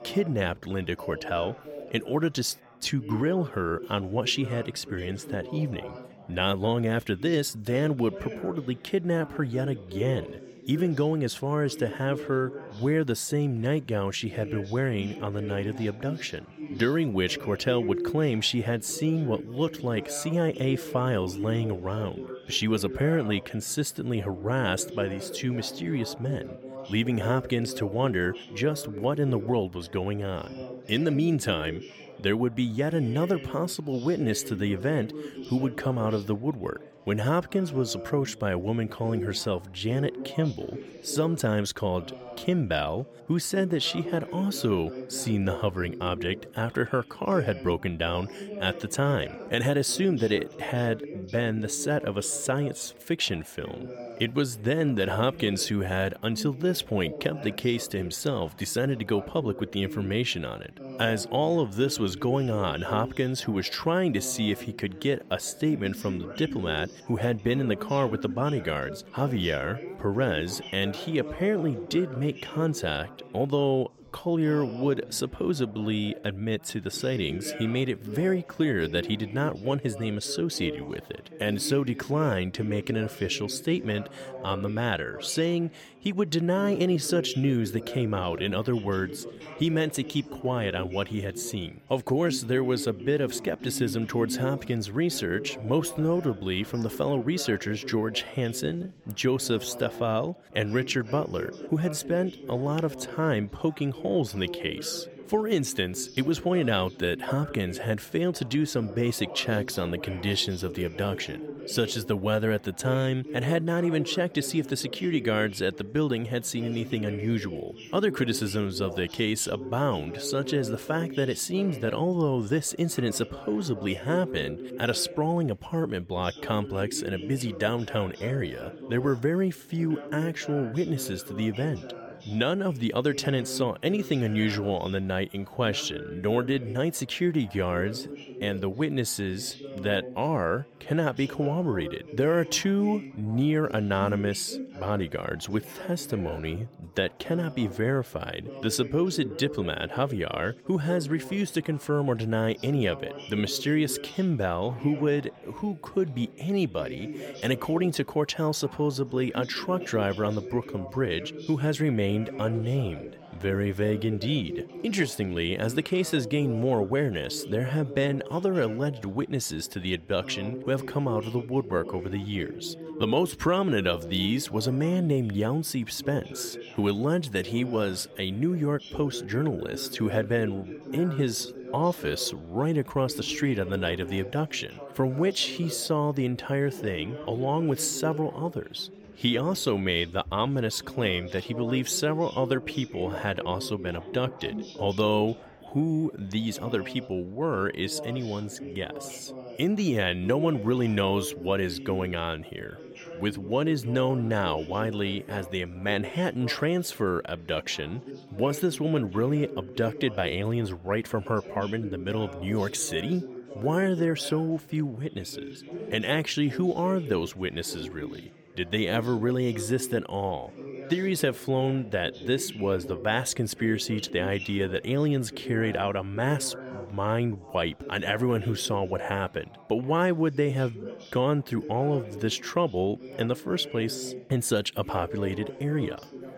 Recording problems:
background chatter; noticeable; throughout; 4 voices, 10 dB below the speech

